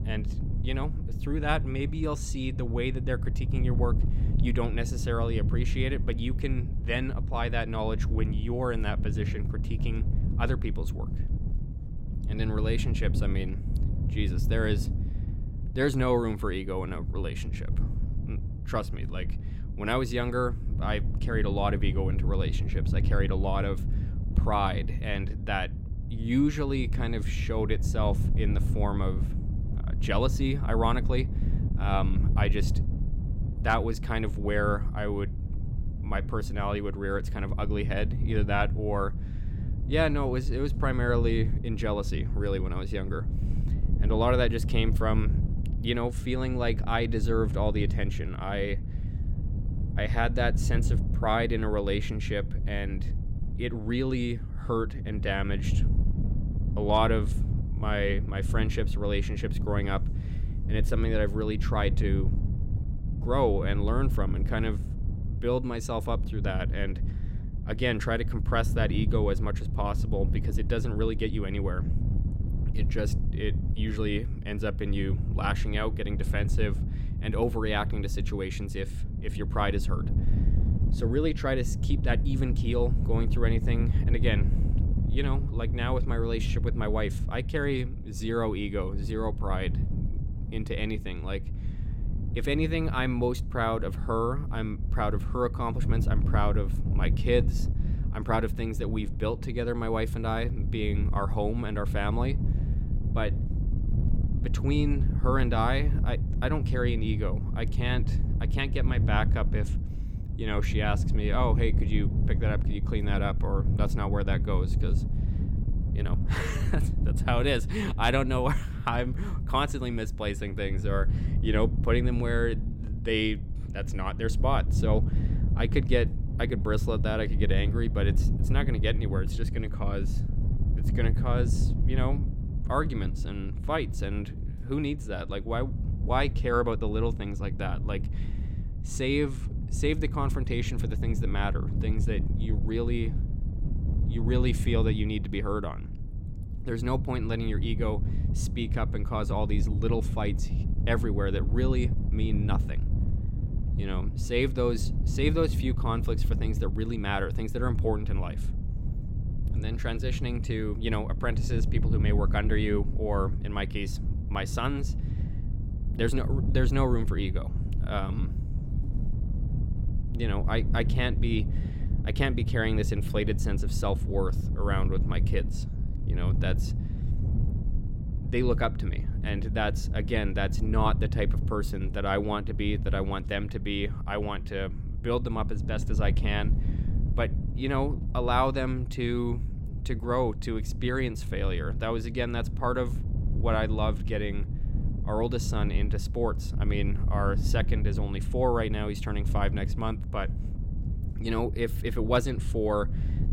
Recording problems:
wind noise on the microphone; occasional gusts; 10 dB below the speech

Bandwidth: 16.5 kHz